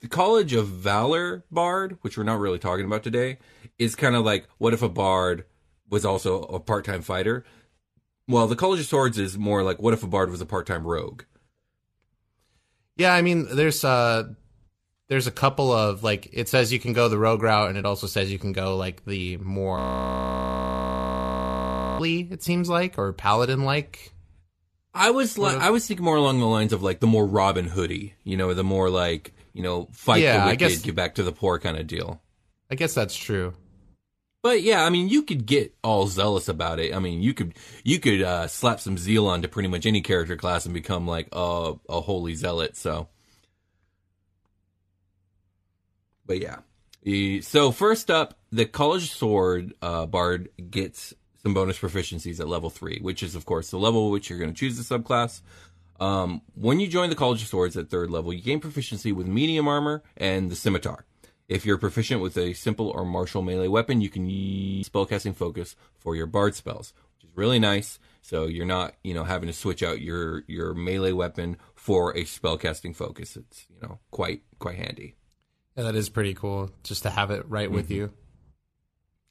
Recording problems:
audio freezing; at 20 s for 2 s and at 1:04 for 0.5 s

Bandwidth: 14 kHz